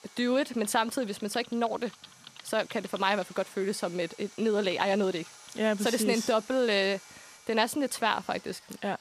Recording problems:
household noises; faint; throughout; 20 dB below the speech
machinery noise; faint; throughout; 20 dB below the speech

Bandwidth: 14.5 kHz